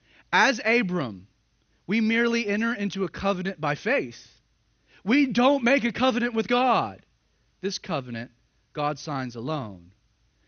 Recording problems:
garbled, watery; slightly; nothing above 6.5 kHz

